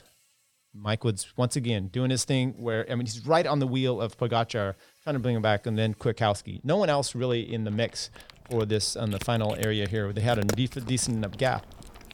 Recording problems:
animal sounds; noticeable; throughout; 15 dB below the speech

